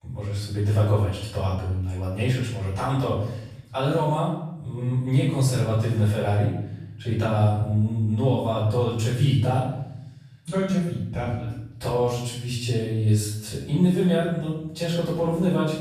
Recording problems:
off-mic speech; far
room echo; noticeable; dies away in 0.8 s

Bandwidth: 14.5 kHz